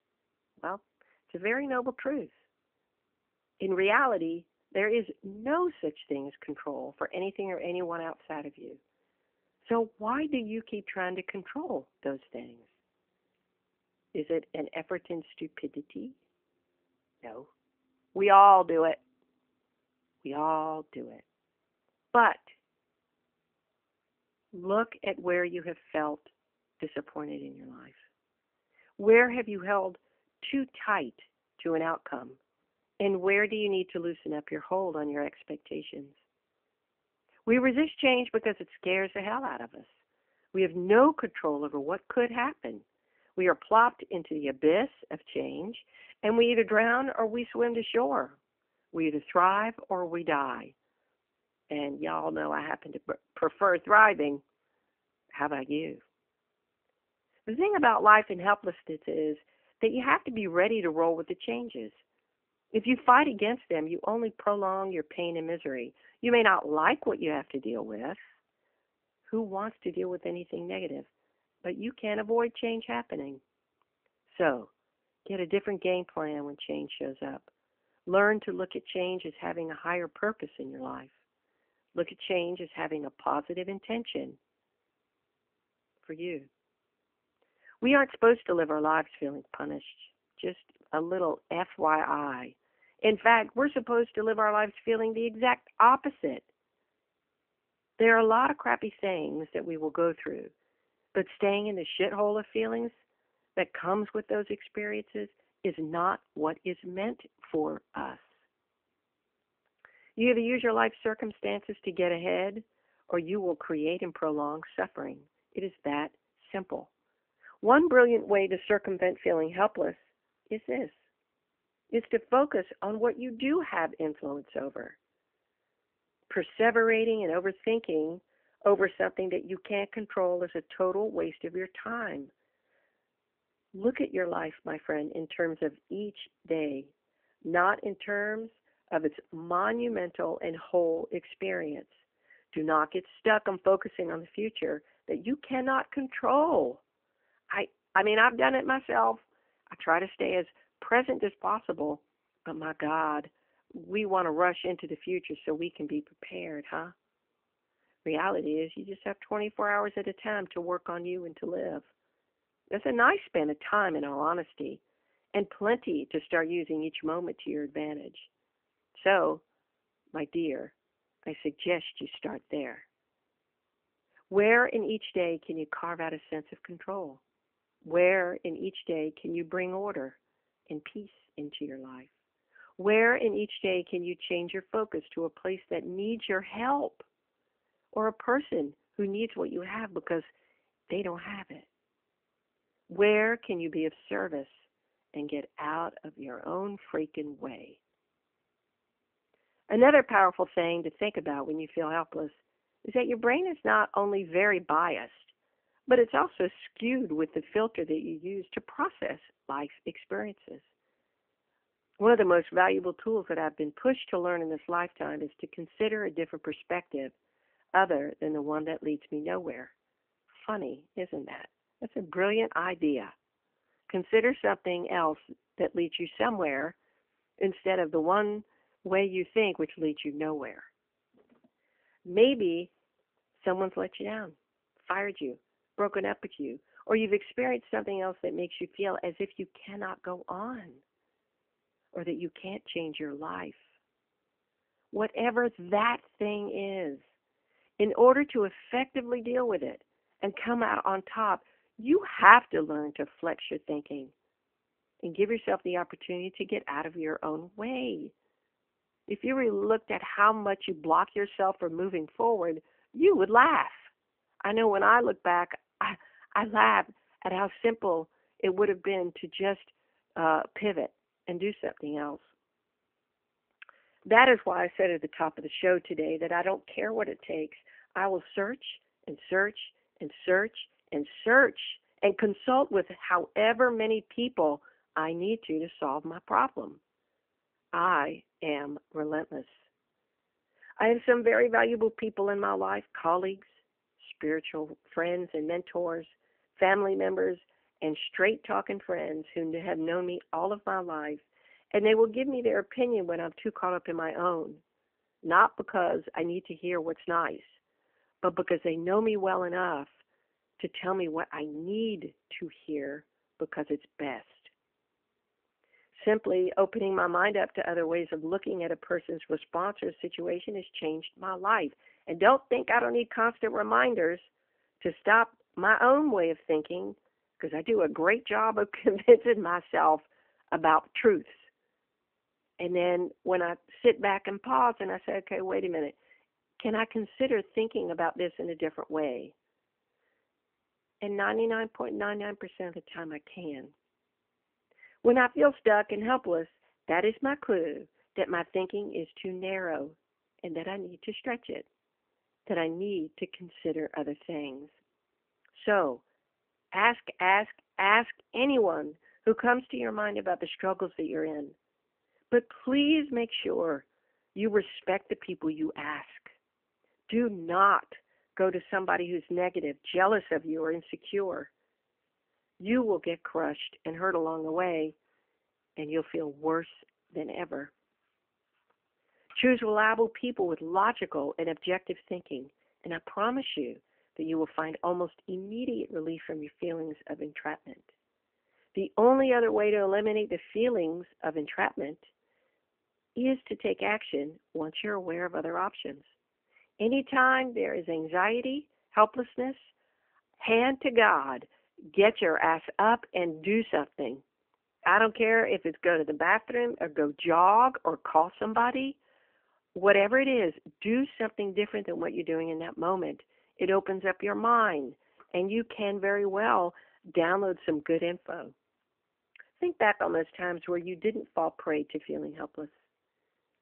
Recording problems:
phone-call audio; nothing above 3 kHz

